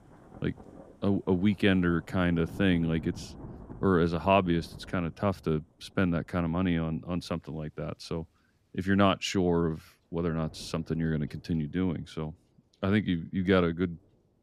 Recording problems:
rain or running water; faint; throughout; 20 dB below the speech

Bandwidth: 15.5 kHz